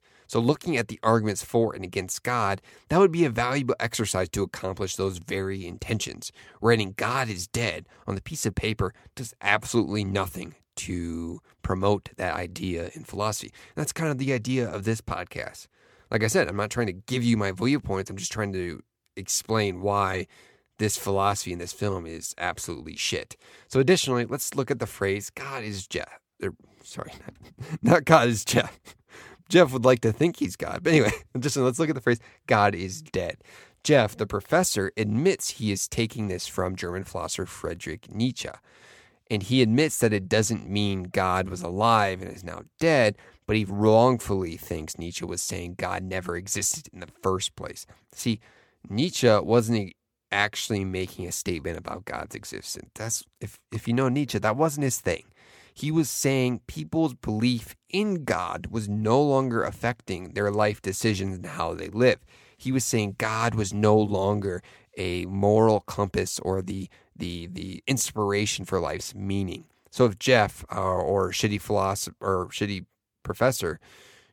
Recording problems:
none

